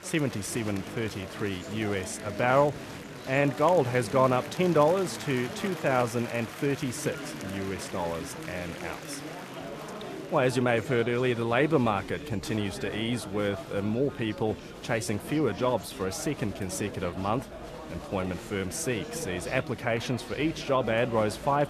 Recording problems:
chatter from many people; noticeable; throughout; 10 dB below the speech

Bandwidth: 14 kHz